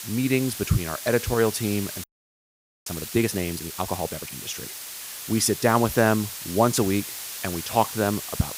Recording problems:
hiss; loud; throughout; 9 dB below the speech
audio freezing; at 2 s for 1 s

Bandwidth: 15.5 kHz